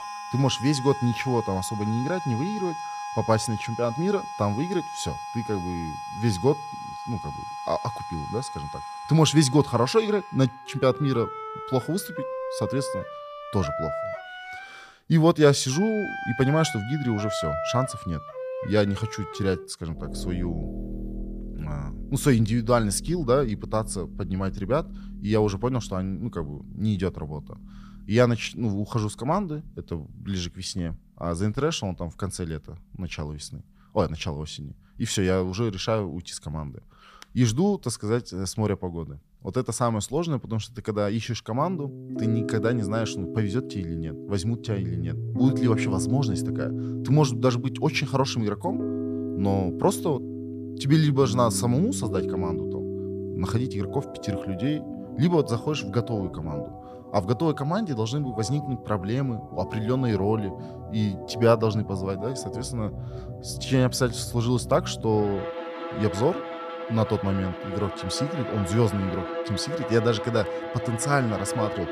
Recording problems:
background music; loud; throughout; 8 dB below the speech

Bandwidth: 15 kHz